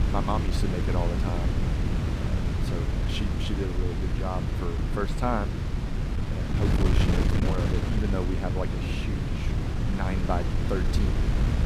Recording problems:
wind noise on the microphone; heavy; 1 dB below the speech
chatter from many people; faint; throughout; 25 dB below the speech

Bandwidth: 15 kHz